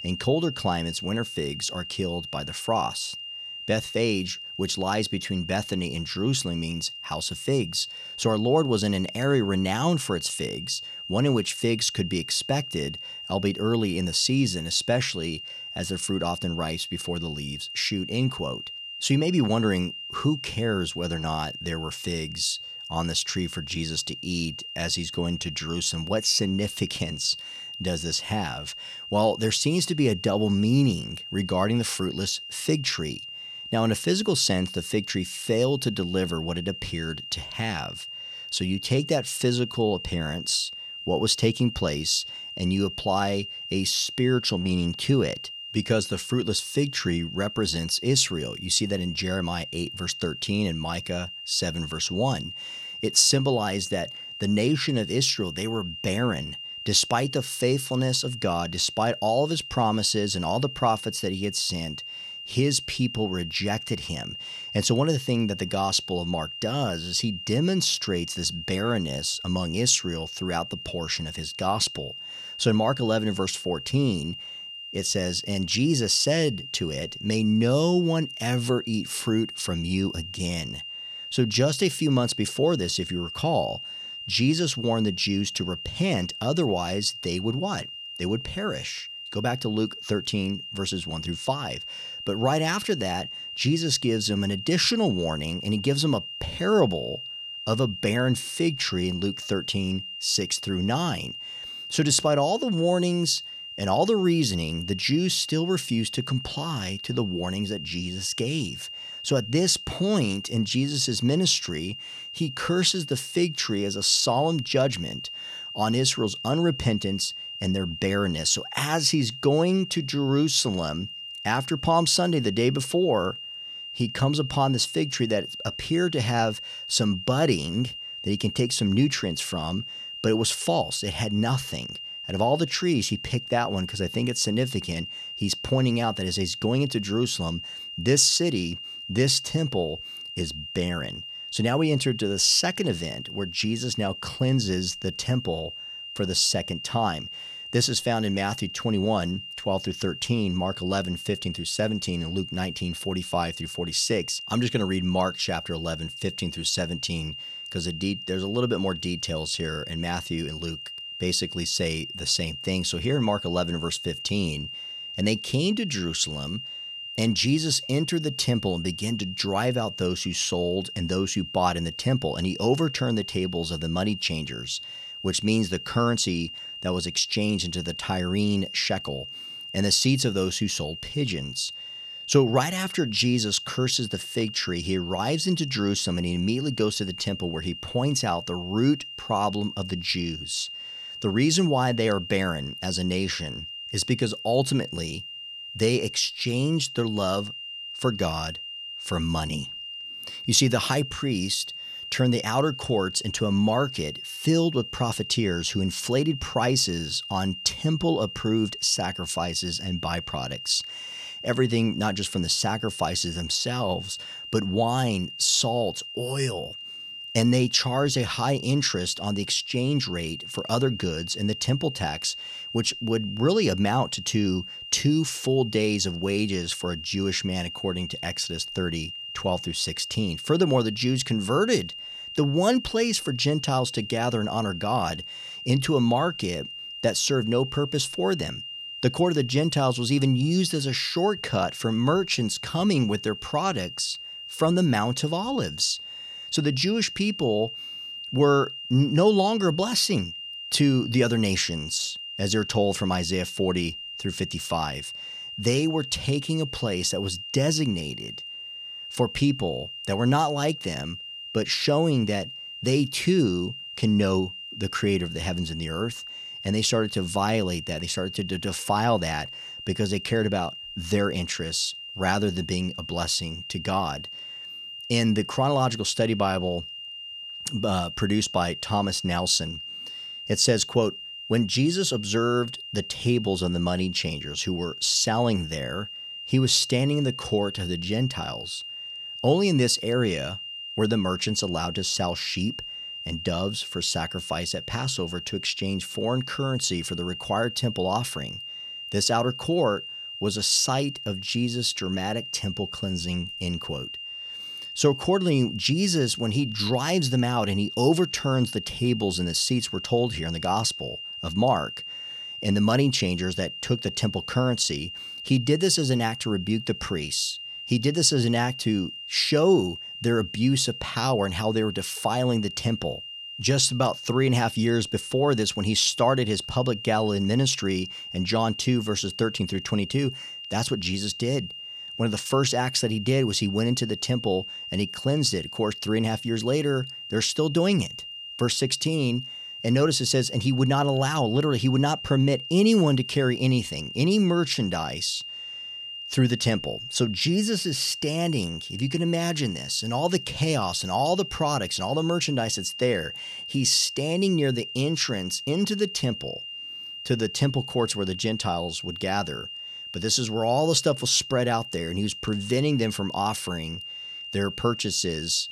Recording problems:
high-pitched whine; loud; throughout; 3 kHz, 10 dB below the speech

